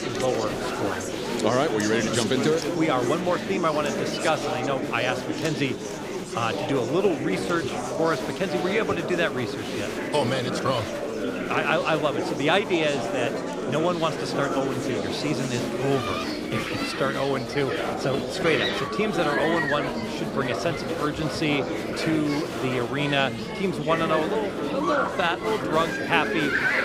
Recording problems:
murmuring crowd; loud; throughout; 2 dB below the speech

